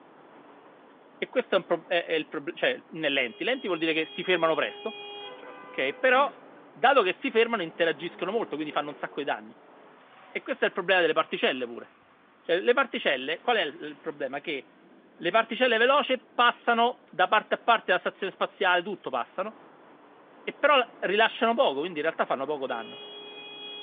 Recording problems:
phone-call audio
traffic noise; faint; throughout; 20 dB below the speech

